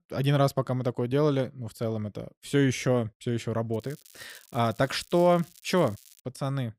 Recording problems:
crackling; faint; from 3.5 to 6 s; 25 dB below the speech

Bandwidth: 15.5 kHz